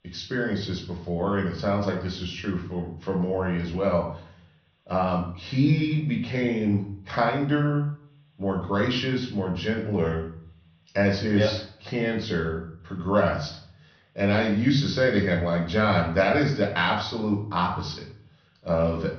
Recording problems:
high frequencies cut off; noticeable; nothing above 6 kHz
room echo; slight; dies away in 0.5 s
off-mic speech; somewhat distant

